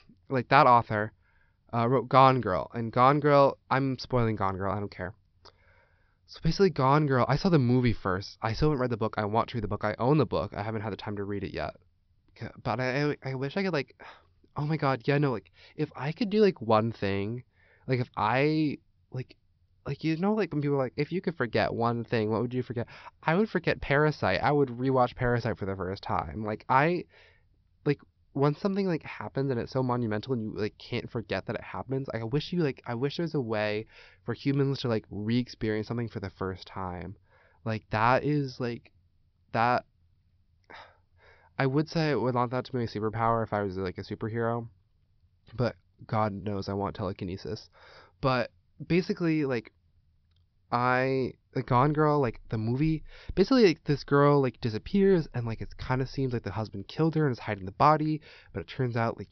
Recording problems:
high frequencies cut off; noticeable; nothing above 5.5 kHz

